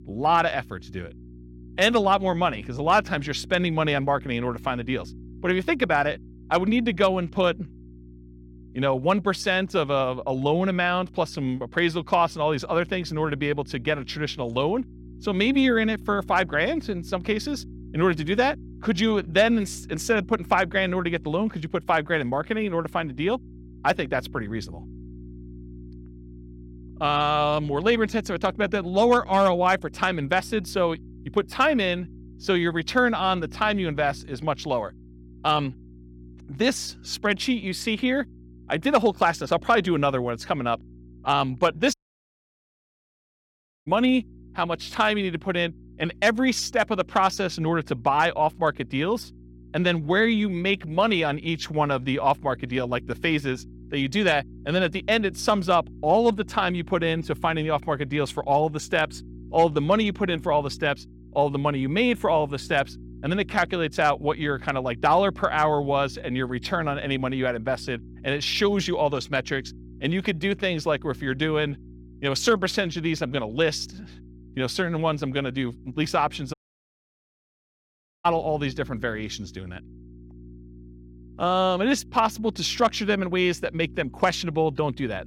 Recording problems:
electrical hum; faint; throughout; 60 Hz, 30 dB below the speech
audio cutting out; at 42 s for 2 s and at 1:17 for 1.5 s

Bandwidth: 16.5 kHz